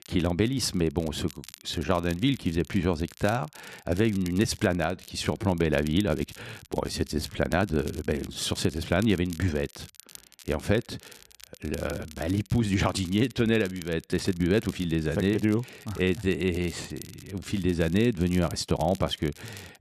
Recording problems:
crackle, like an old record; faint; 20 dB below the speech
uneven, jittery; strongly; from 1.5 to 19 s

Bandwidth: 13.5 kHz